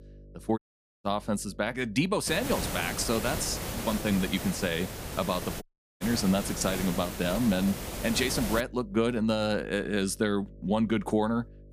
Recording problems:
hiss; loud; from 2.5 to 8.5 s; 6 dB below the speech
electrical hum; faint; throughout; 50 Hz, 25 dB below the speech
audio cutting out; at 0.5 s and at 5.5 s

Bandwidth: 15 kHz